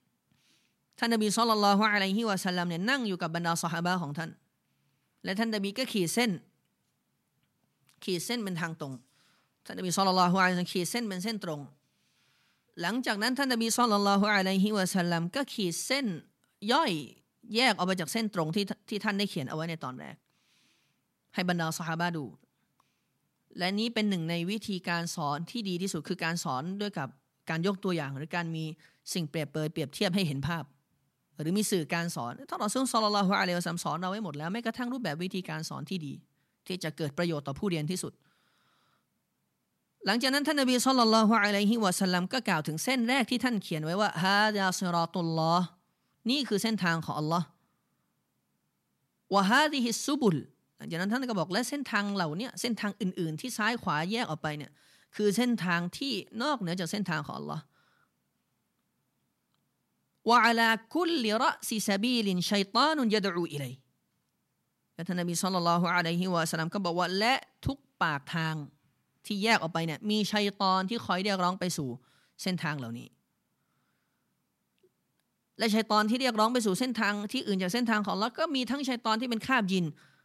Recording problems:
none

